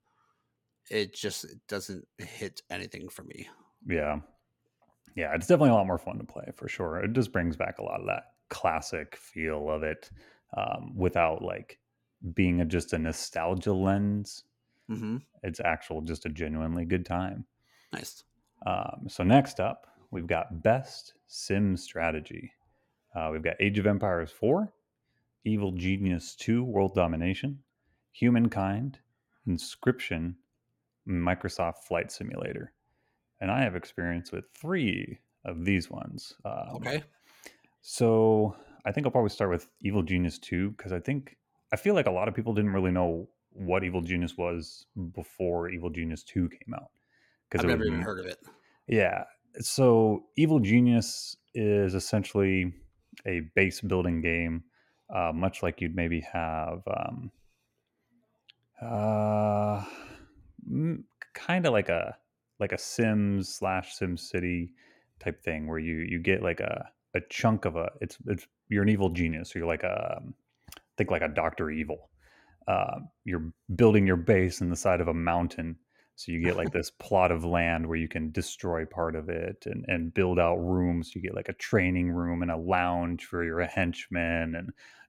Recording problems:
none

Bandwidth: 17 kHz